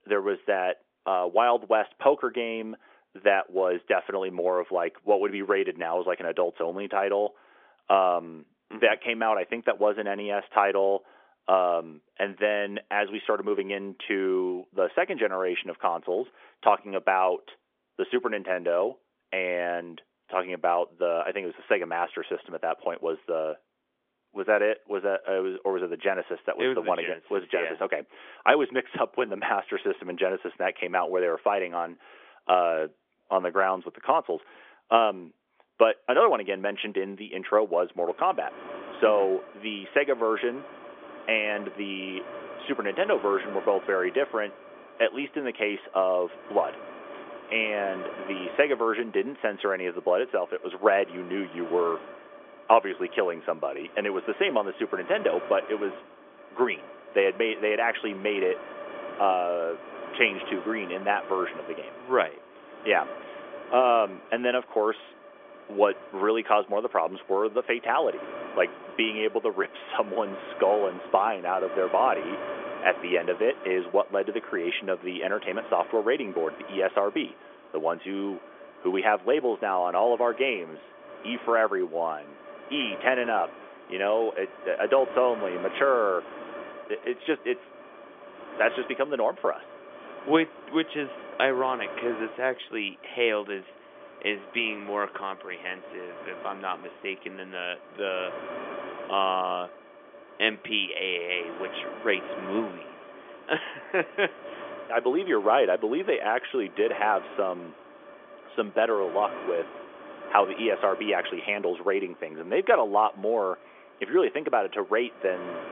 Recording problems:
phone-call audio; nothing above 3.5 kHz
wind noise on the microphone; occasional gusts; from 38 s on; 15 dB below the speech

